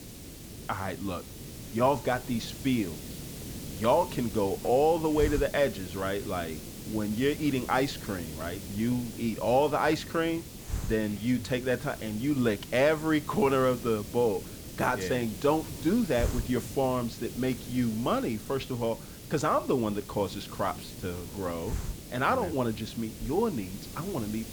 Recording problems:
hiss; noticeable; throughout; 10 dB below the speech

